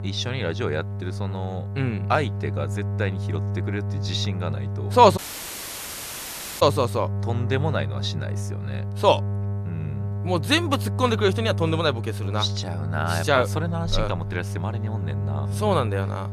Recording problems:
electrical hum; noticeable; throughout; 50 Hz, 15 dB below the speech
audio cutting out; at 5 s for 1.5 s

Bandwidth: 14 kHz